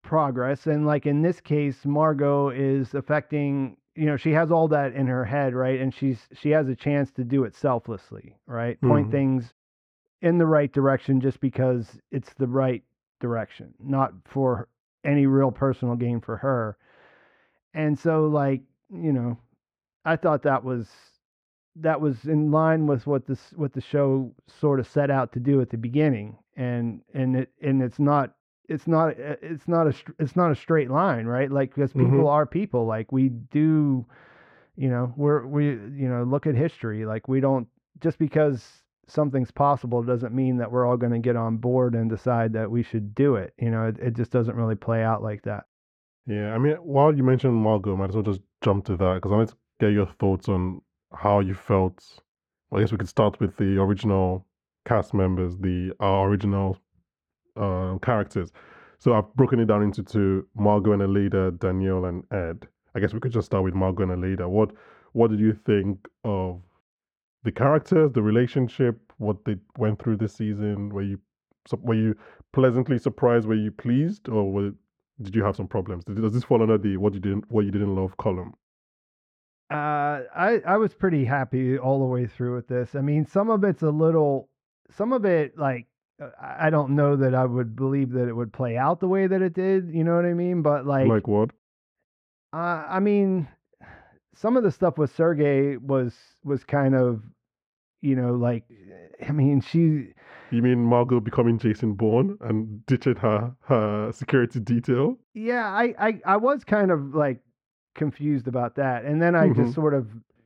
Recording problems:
muffled; very; fading above 4 kHz

